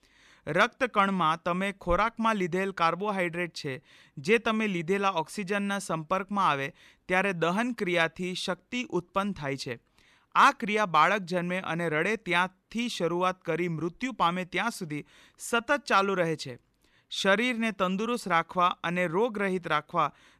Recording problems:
none

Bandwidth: 13.5 kHz